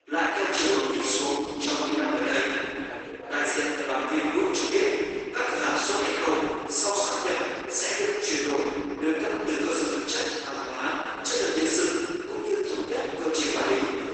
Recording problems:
room echo; strong; dies away in 2.5 s
off-mic speech; far
garbled, watery; badly; nothing above 8 kHz
thin; somewhat; fading below 300 Hz
background chatter; noticeable; throughout; 3 voices, 15 dB below the speech

